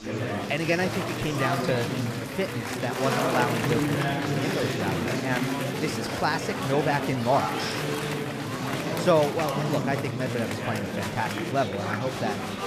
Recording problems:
chatter from many people; very loud; throughout; as loud as the speech

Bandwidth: 14.5 kHz